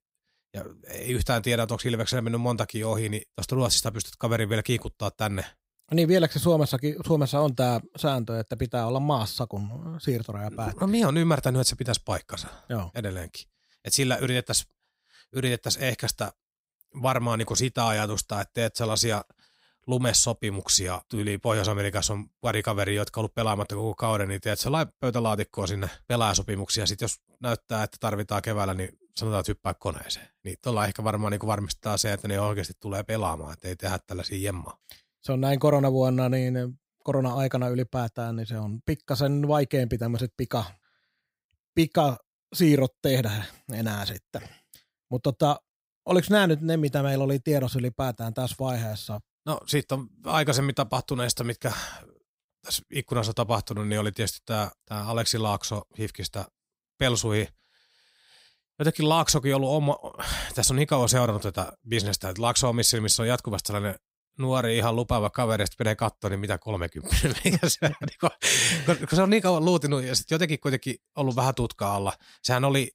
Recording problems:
none

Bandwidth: 15.5 kHz